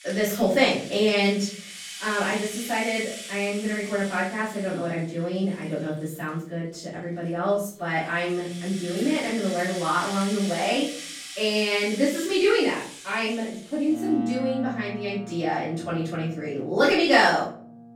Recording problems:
off-mic speech; far
room echo; noticeable; dies away in 0.6 s
background music; noticeable; throughout; 10 dB below the speech

